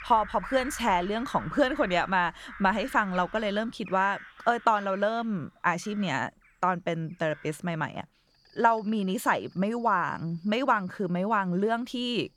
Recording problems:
animal sounds; noticeable; throughout; 15 dB below the speech

